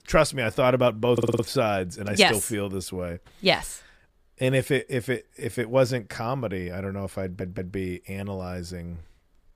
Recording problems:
audio stuttering; at 1 s and at 7 s

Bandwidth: 15 kHz